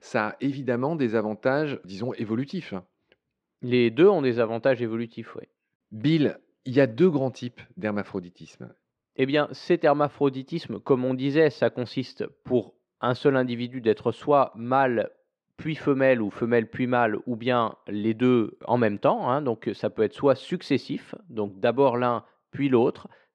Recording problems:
muffled; slightly; fading above 2.5 kHz

